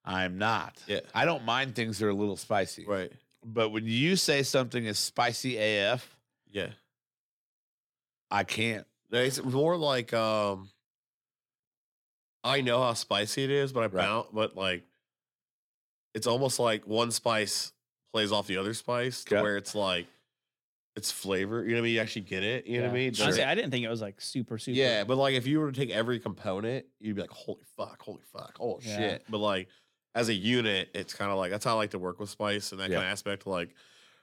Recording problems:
none

